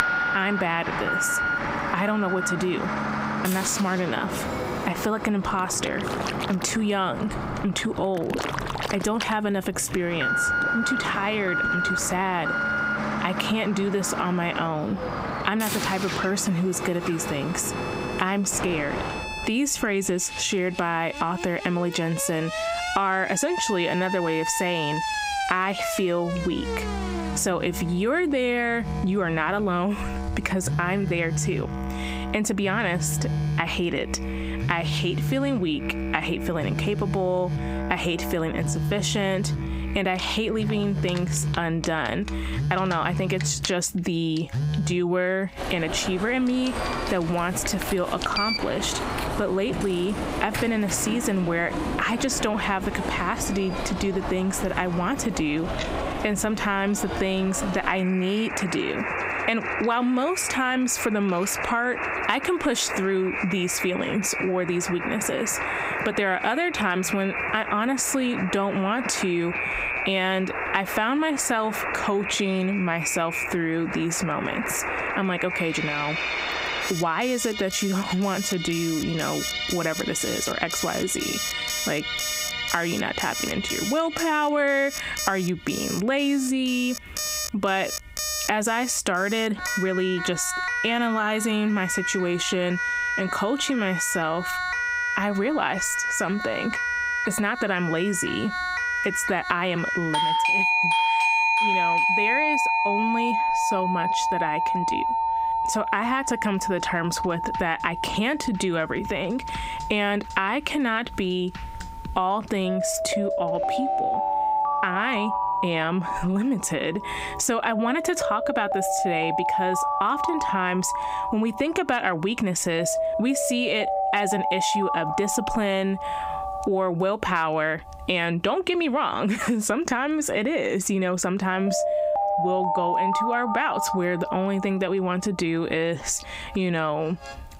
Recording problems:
squashed, flat; heavily, background pumping
alarms or sirens; loud; throughout; 3 dB below the speech
household noises; noticeable; throughout; 20 dB below the speech
background music; noticeable; throughout; 10 dB below the speech

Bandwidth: 15.5 kHz